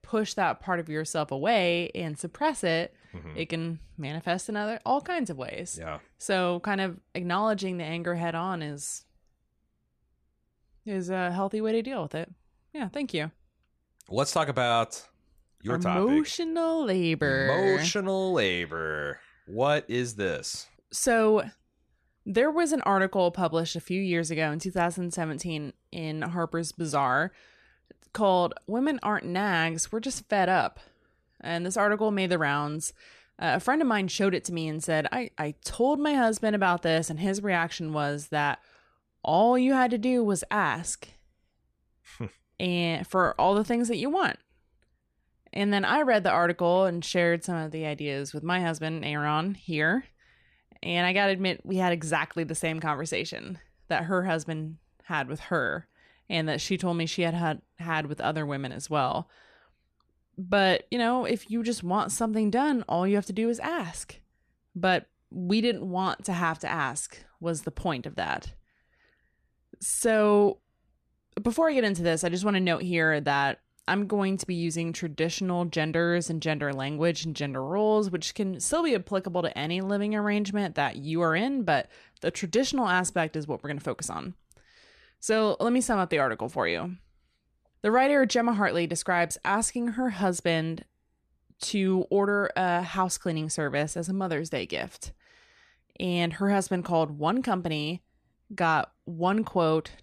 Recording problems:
none

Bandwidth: 14 kHz